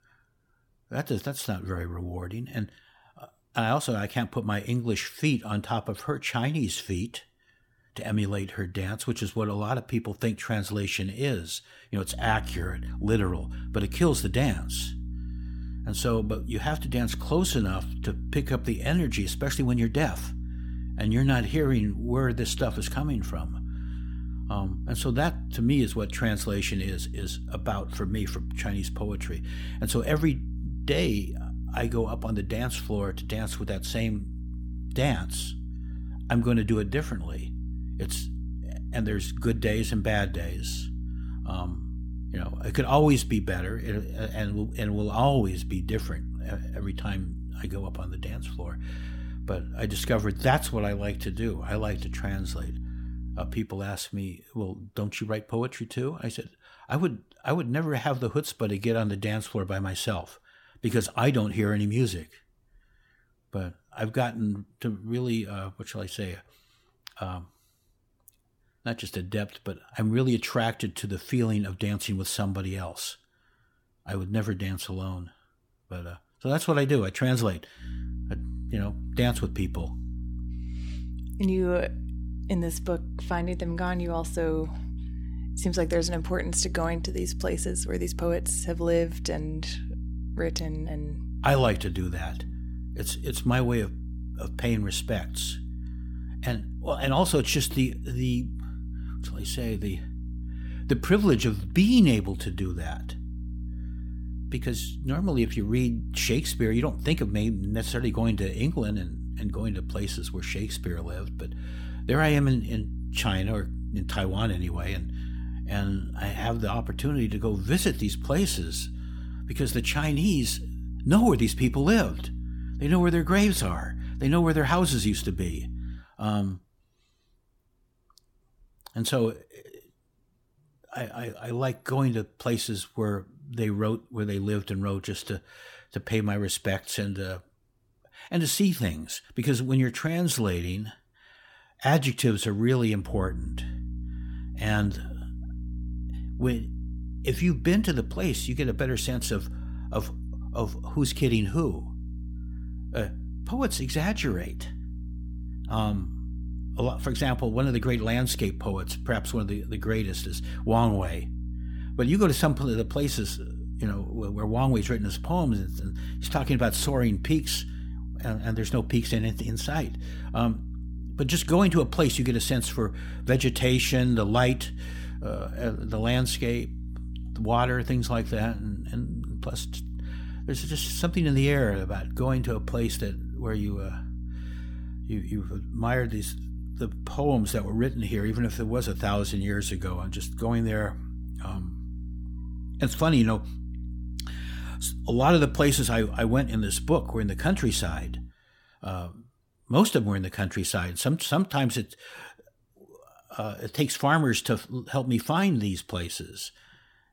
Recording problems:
electrical hum; noticeable; from 12 to 54 s, from 1:18 to 2:06 and from 2:23 to 3:18; 60 Hz, 20 dB below the speech

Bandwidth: 17 kHz